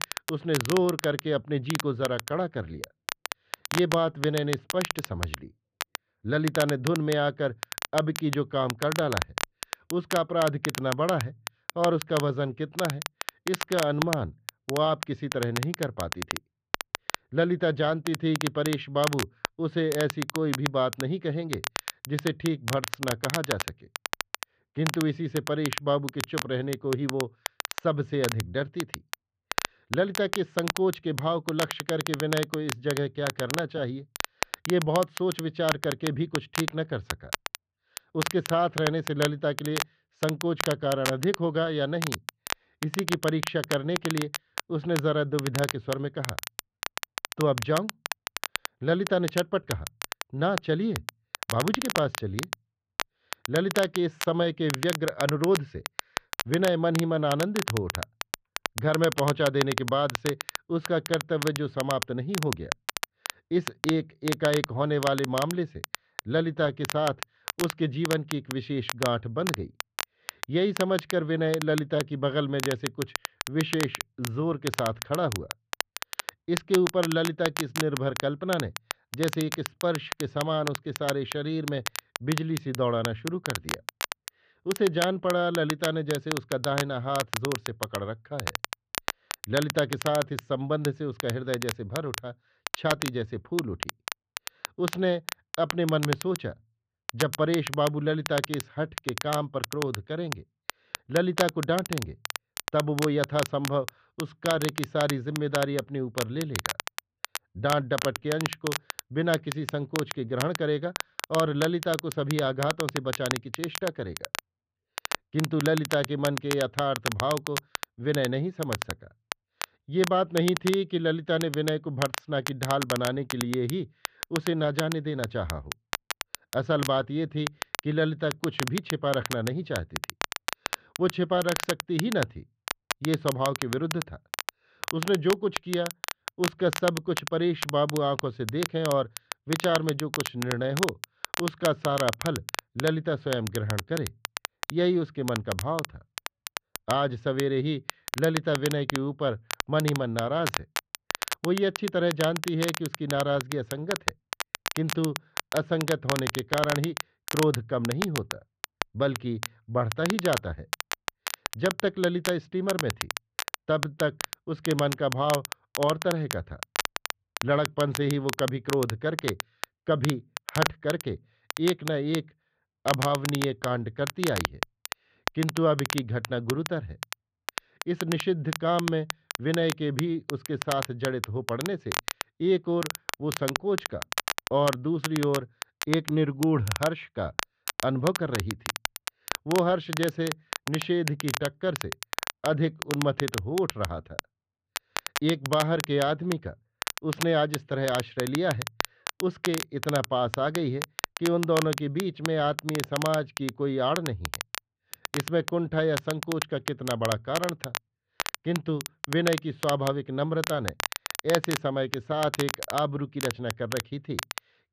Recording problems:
muffled; very; fading above 3 kHz
crackle, like an old record; loud; 6 dB below the speech

